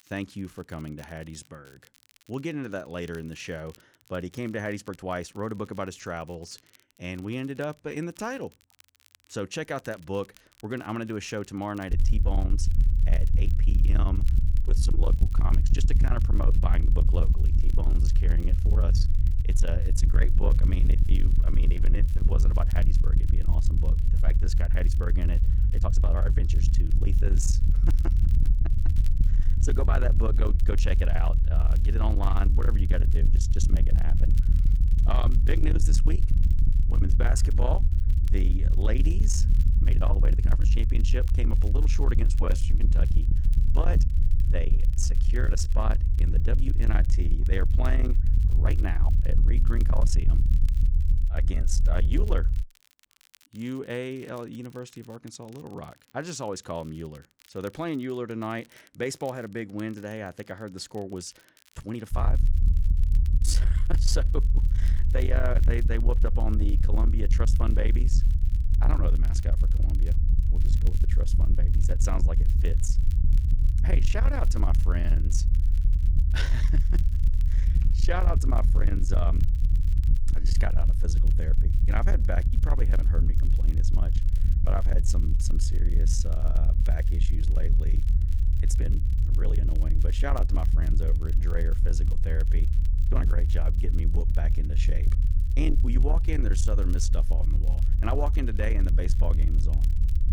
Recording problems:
distortion; slight; 10 dB below the speech
low rumble; loud; from 12 to 53 s and from 1:02 on; 7 dB below the speech
crackle, like an old record; faint; 20 dB below the speech
uneven, jittery; strongly; from 4 s to 1:33

